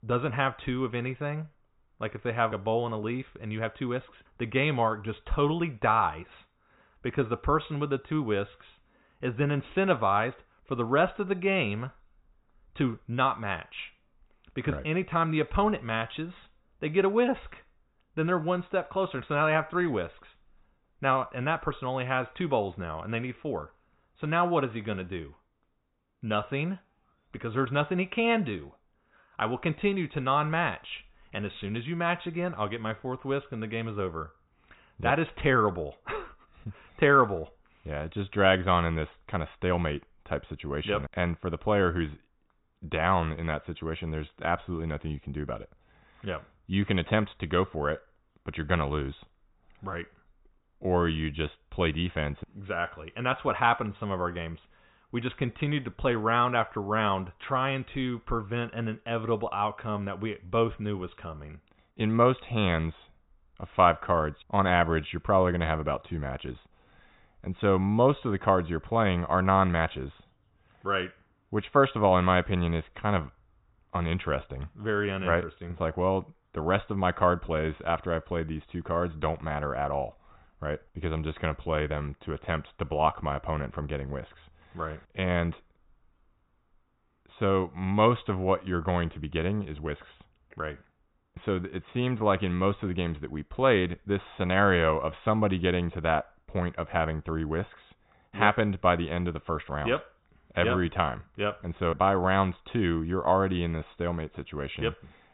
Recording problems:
high frequencies cut off; severe; nothing above 4 kHz

